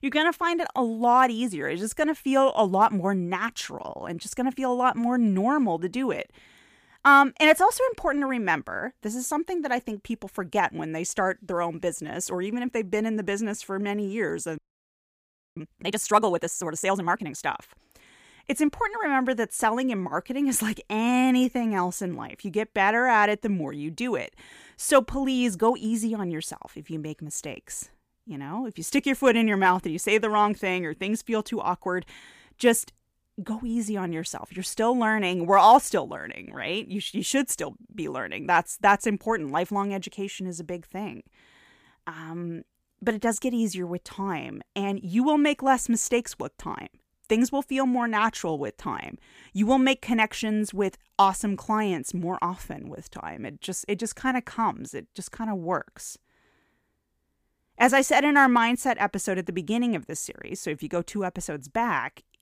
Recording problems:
audio freezing; at 15 s for 1 s

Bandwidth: 15 kHz